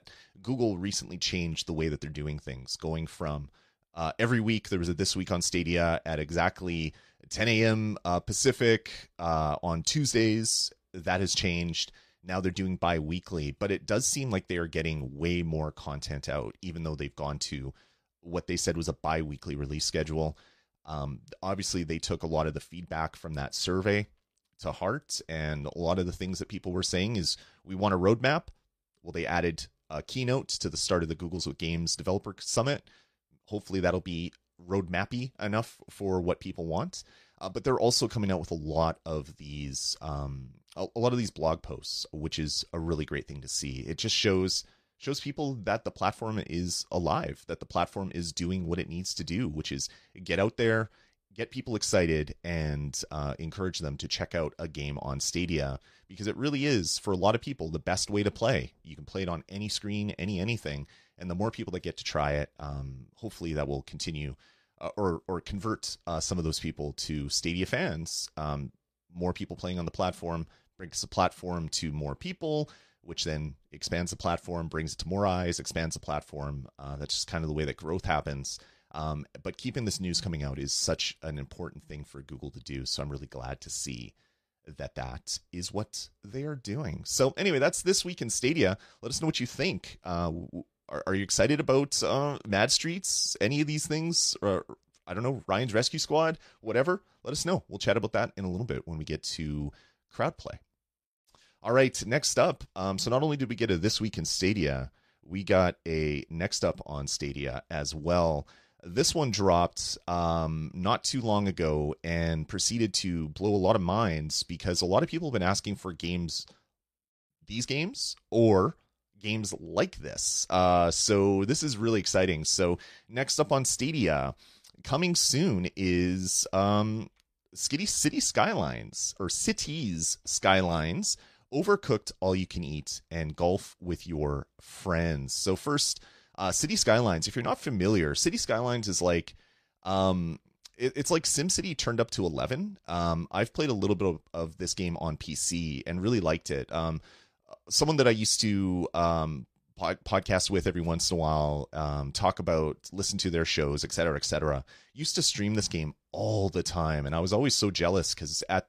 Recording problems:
none

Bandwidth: 14.5 kHz